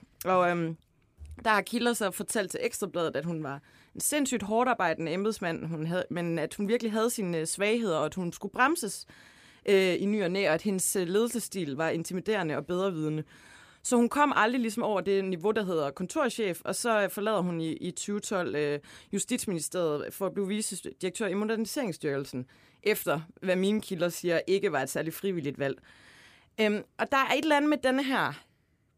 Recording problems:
none

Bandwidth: 15 kHz